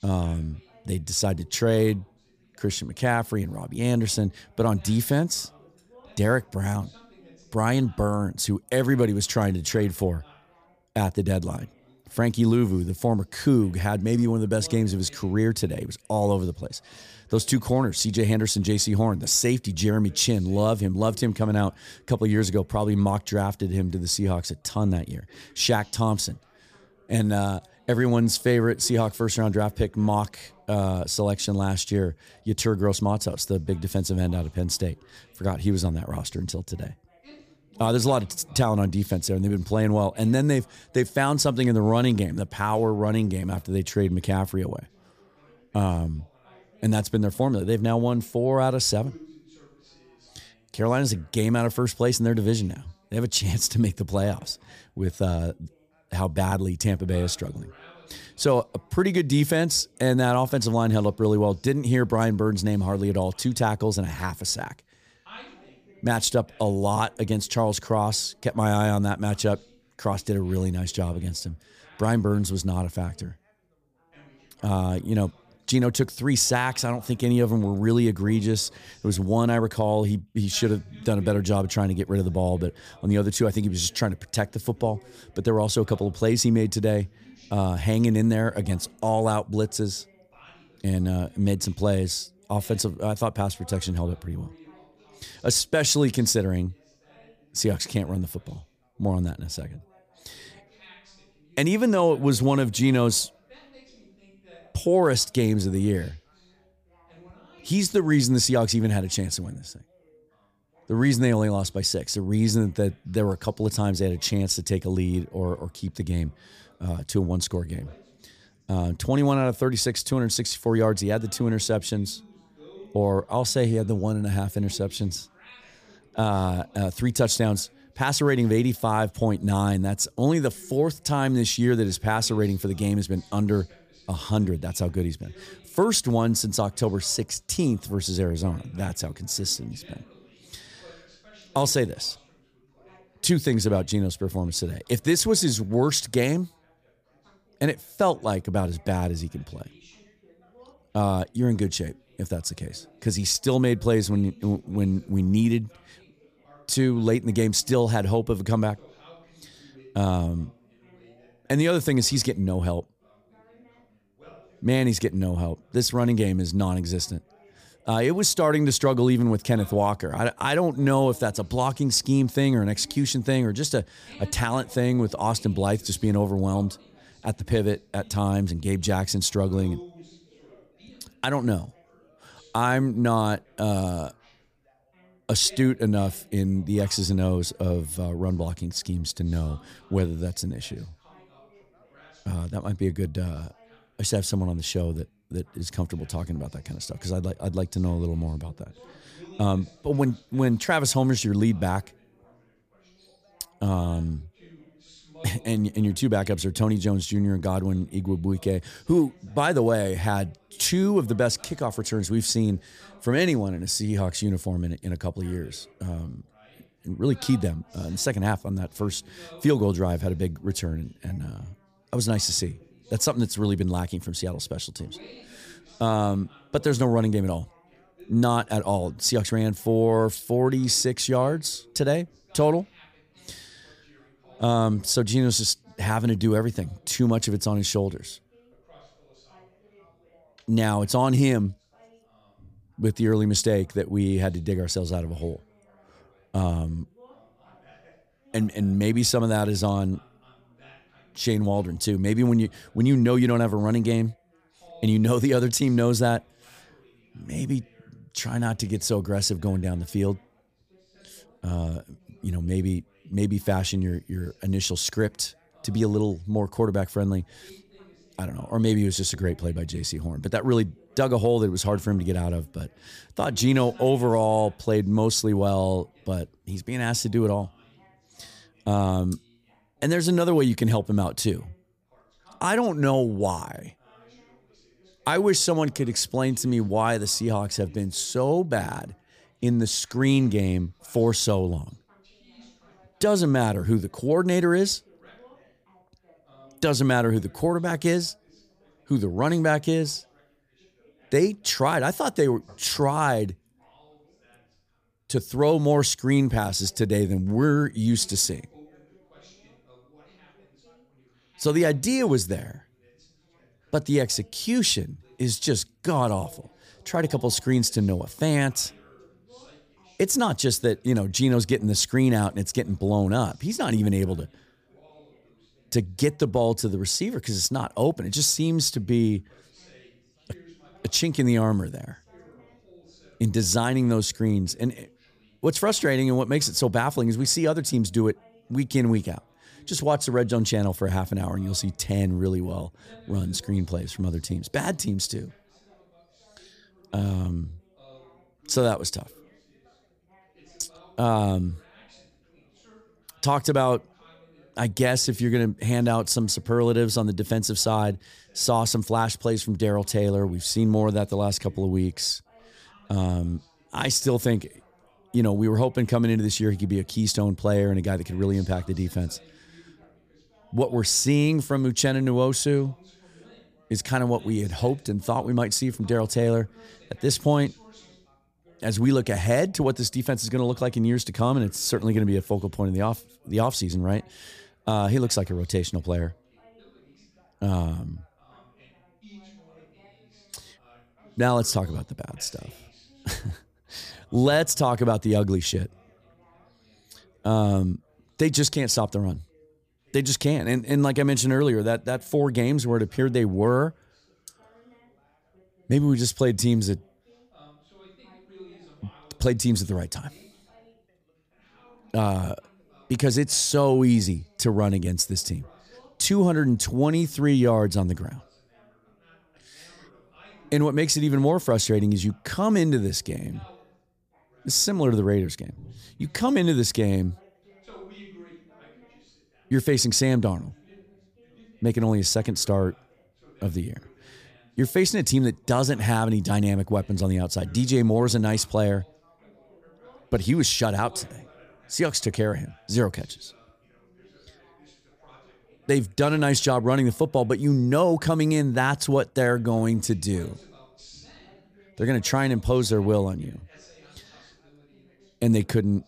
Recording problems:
background chatter; faint; throughout; 3 voices, 30 dB below the speech

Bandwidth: 15 kHz